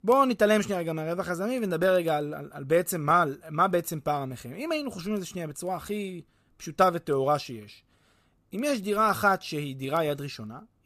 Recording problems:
none

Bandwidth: 14.5 kHz